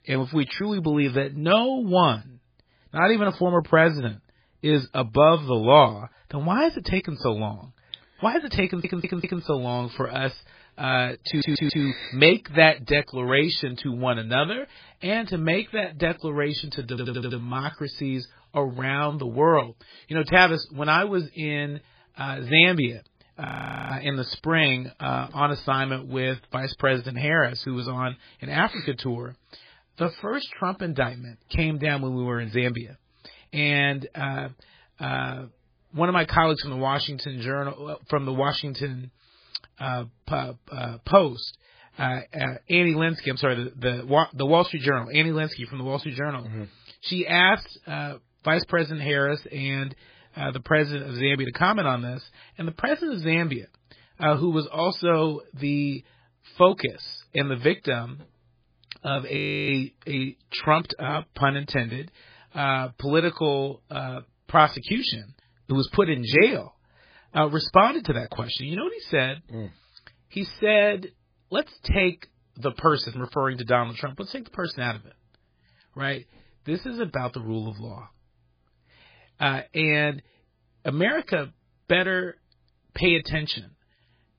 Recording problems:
garbled, watery; badly; nothing above 5 kHz
audio stuttering; at 8.5 s, at 11 s and at 17 s
audio freezing; at 23 s and at 59 s

